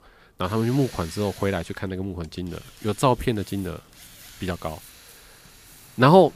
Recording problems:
machinery noise; faint; throughout; 20 dB below the speech
rain or running water; faint; throughout; 25 dB below the speech

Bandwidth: 15 kHz